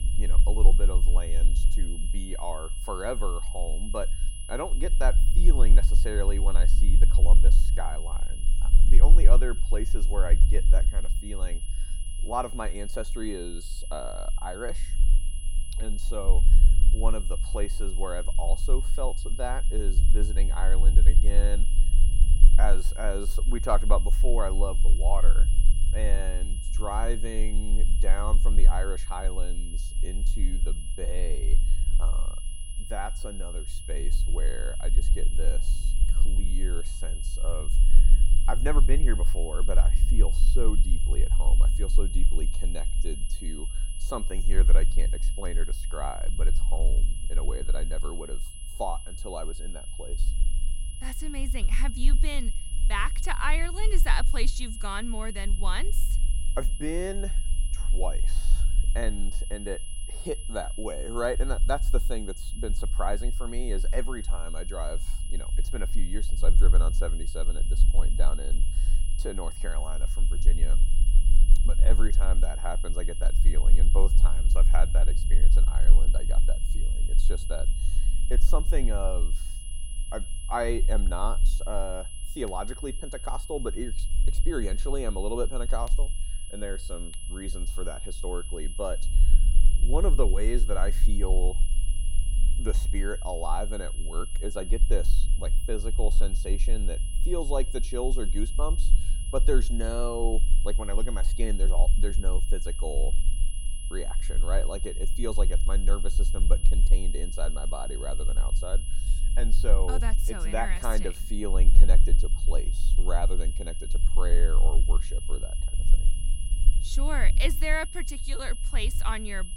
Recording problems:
high-pitched whine; loud; throughout; 10.5 kHz, 6 dB below the speech
low rumble; noticeable; throughout; 15 dB below the speech

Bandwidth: 16 kHz